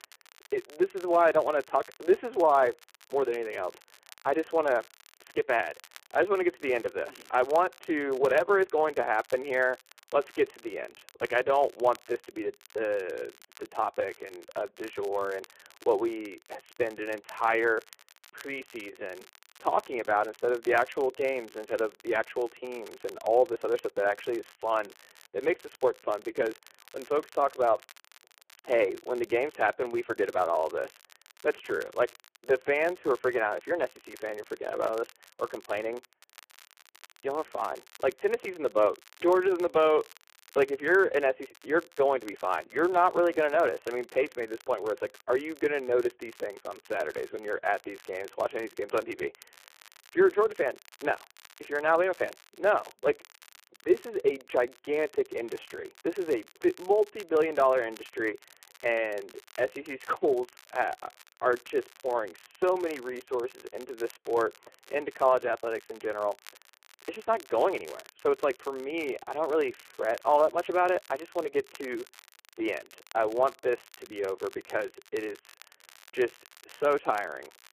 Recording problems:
phone-call audio; poor line
crackle, like an old record; faint; 25 dB below the speech

